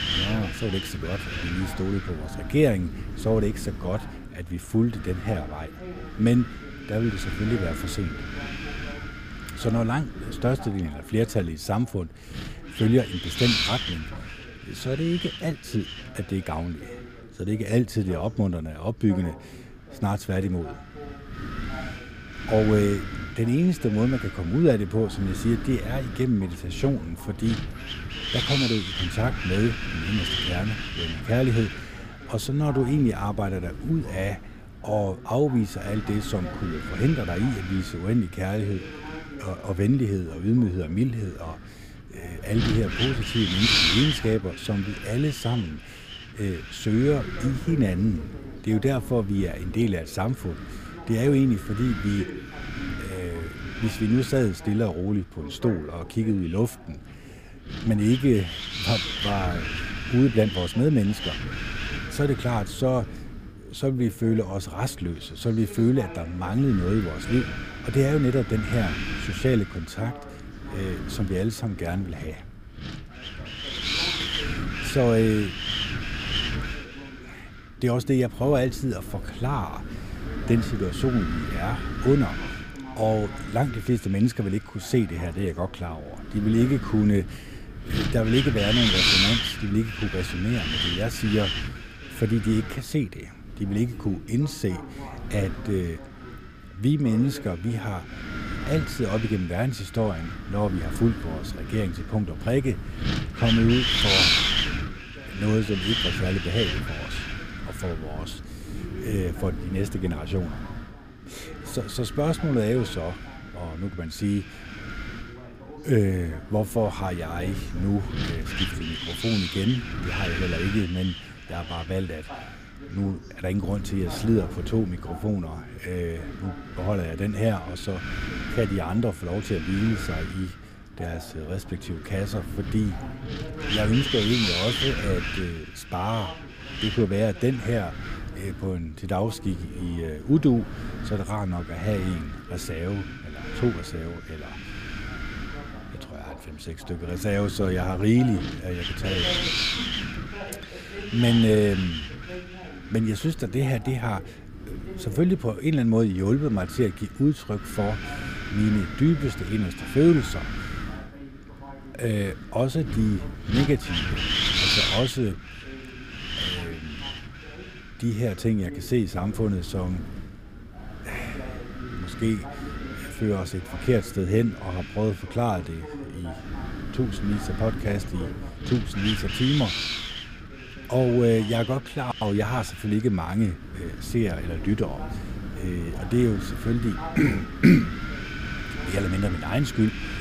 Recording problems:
wind noise on the microphone; heavy; as loud as the speech
voice in the background; noticeable; throughout; 20 dB below the speech

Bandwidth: 15 kHz